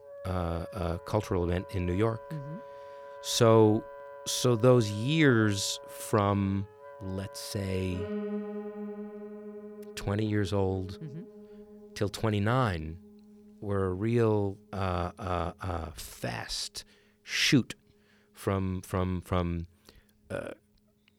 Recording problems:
background music; noticeable; throughout; 15 dB below the speech

